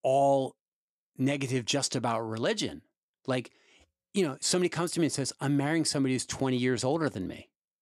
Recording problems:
none

